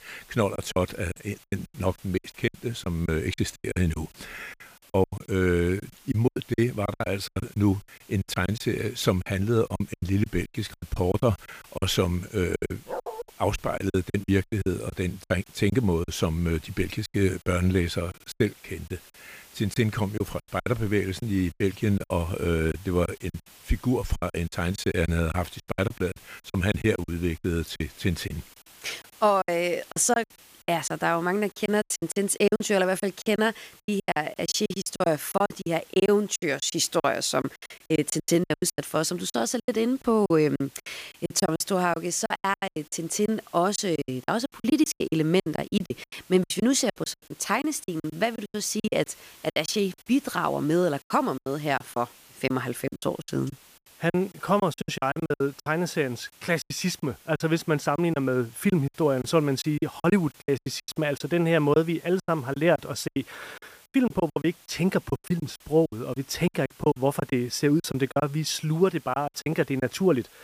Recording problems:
hiss; faint; throughout; 25 dB below the speech
choppy; very; 16% of the speech affected
dog barking; noticeable; at 13 s; peak 8 dB below the speech

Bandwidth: 15 kHz